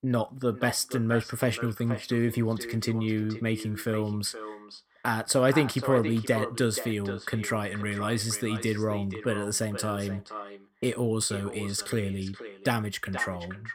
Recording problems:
echo of what is said; strong; throughout; 480 ms later, 10 dB below the speech

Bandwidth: 16.5 kHz